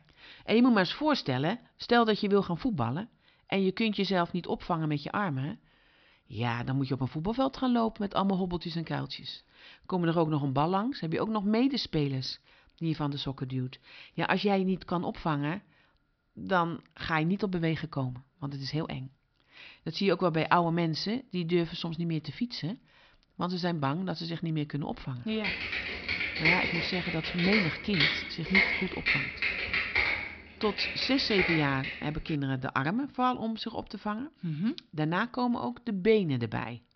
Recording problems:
high frequencies cut off; noticeable; nothing above 5.5 kHz
keyboard typing; loud; from 25 to 32 s; peak 6 dB above the speech

